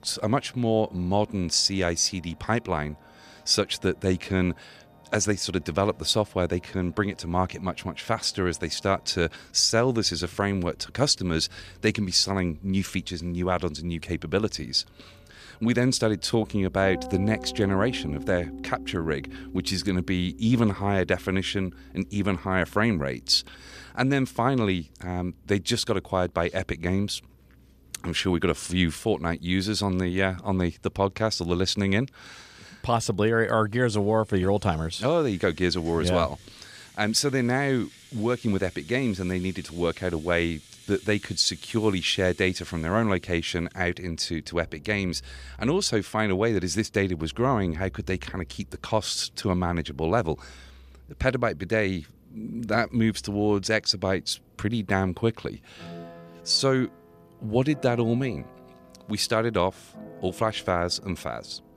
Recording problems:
background music; faint; throughout; 20 dB below the speech

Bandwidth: 14.5 kHz